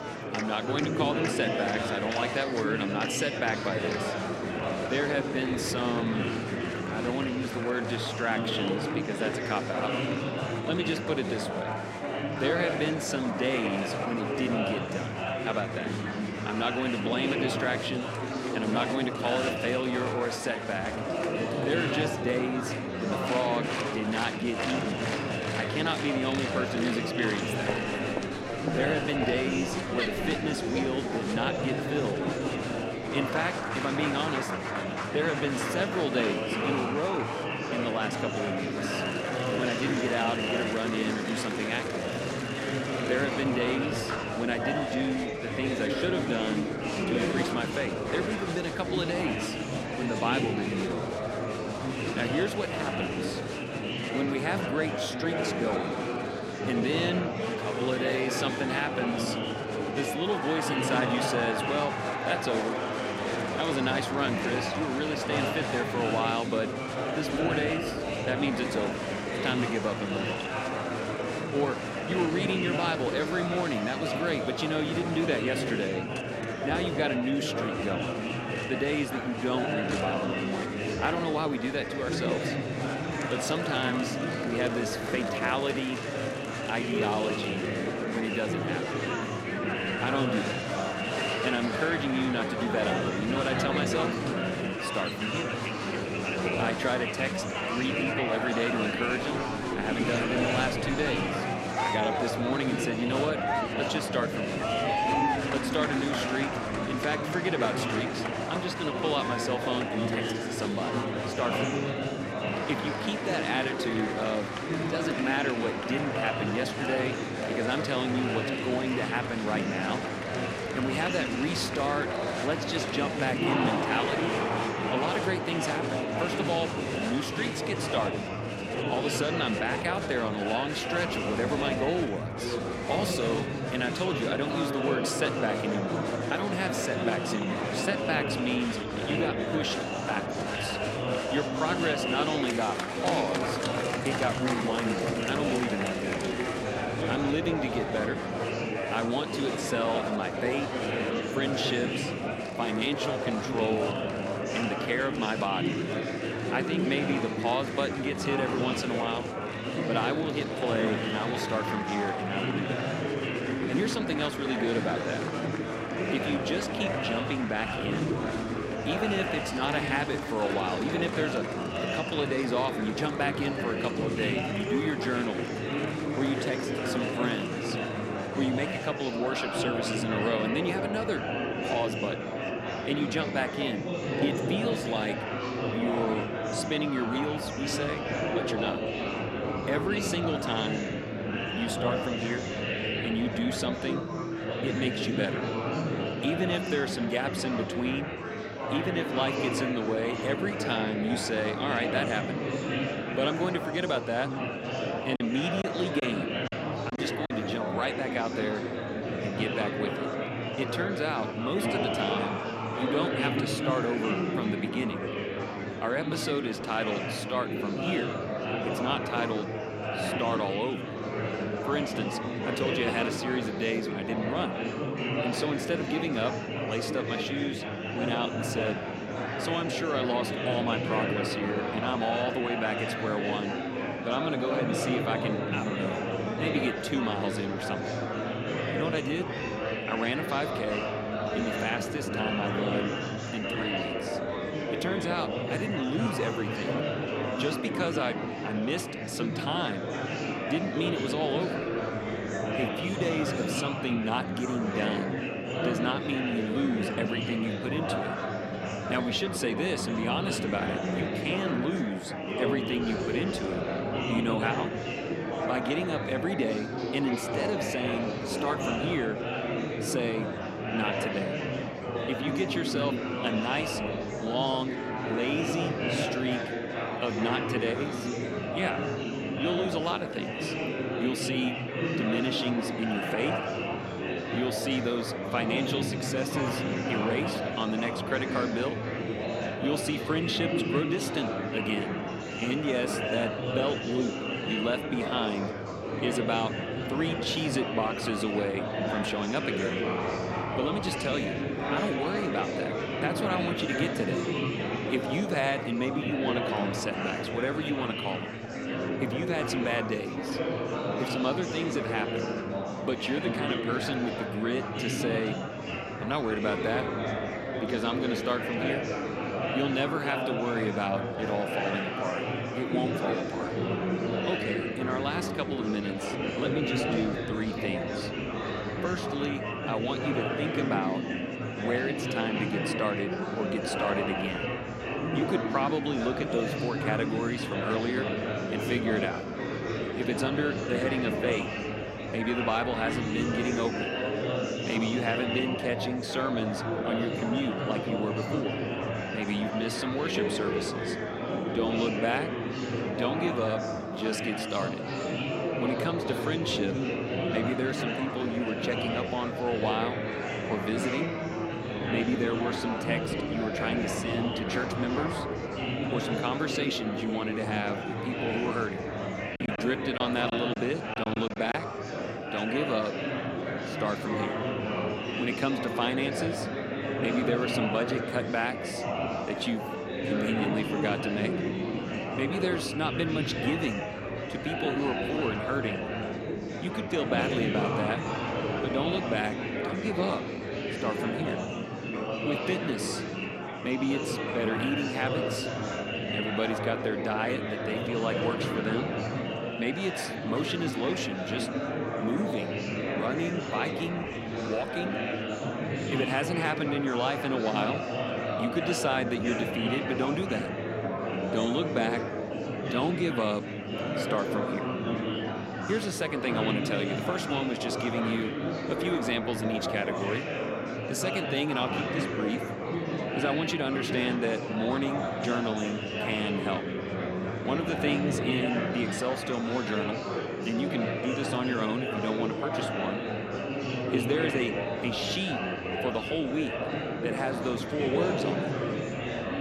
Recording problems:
murmuring crowd; very loud; throughout; 1 dB above the speech
choppy; very; from 3:25 to 3:27 and from 6:09 to 6:12; 10% of the speech affected

